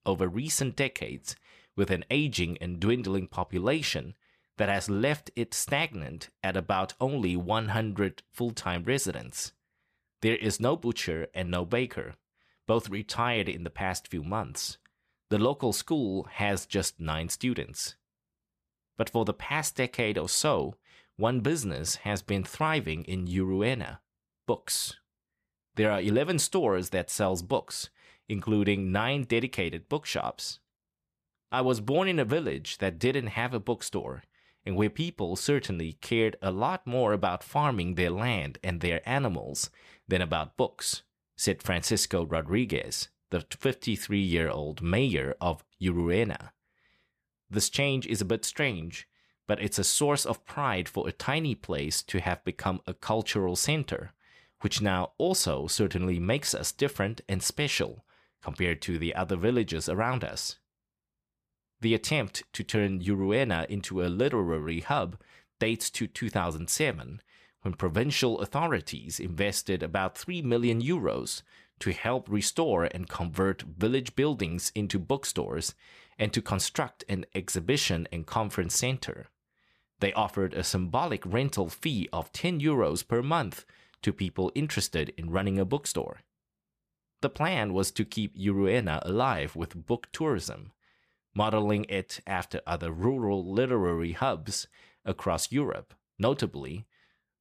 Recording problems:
none

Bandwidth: 14.5 kHz